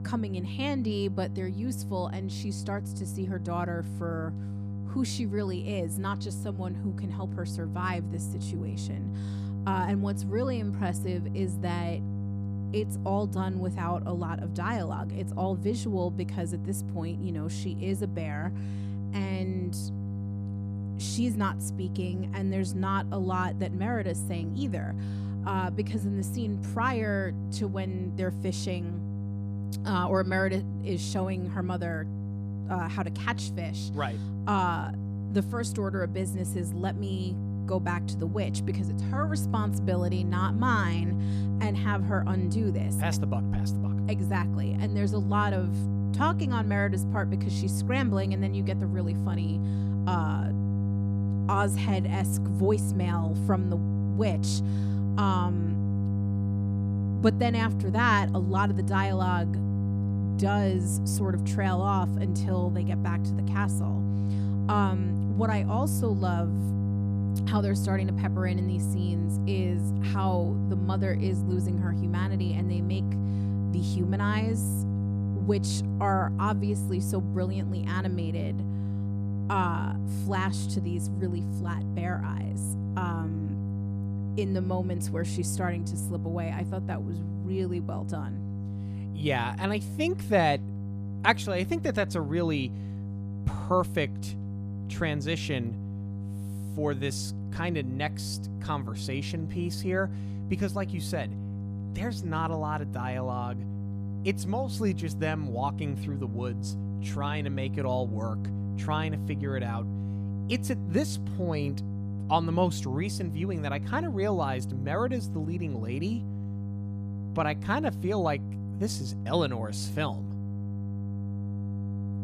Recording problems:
electrical hum; loud; throughout; 50 Hz, 9 dB below the speech

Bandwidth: 14.5 kHz